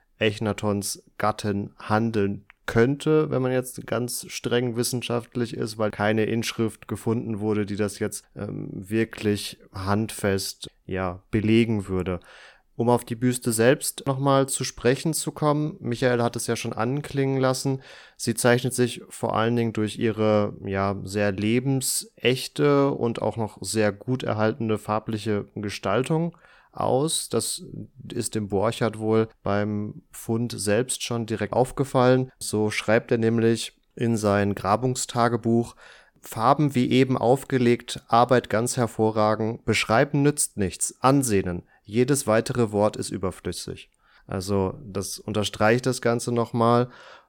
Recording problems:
none

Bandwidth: 18 kHz